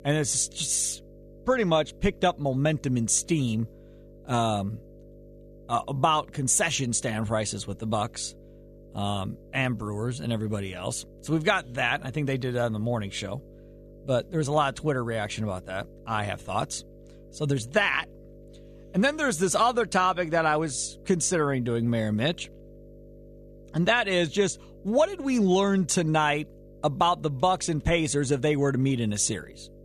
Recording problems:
electrical hum; faint; throughout; 50 Hz, 25 dB below the speech

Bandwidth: 14.5 kHz